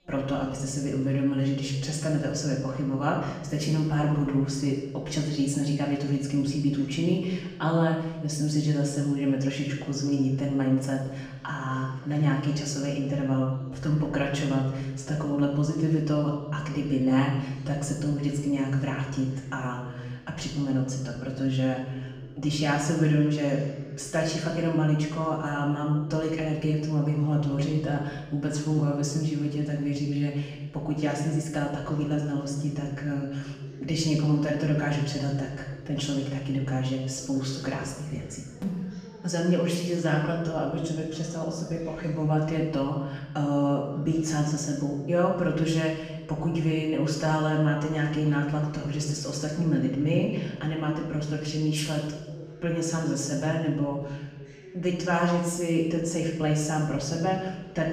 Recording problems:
off-mic speech; far
room echo; noticeable; dies away in 1 s
background chatter; faint; throughout; 2 voices, 20 dB below the speech

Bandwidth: 15 kHz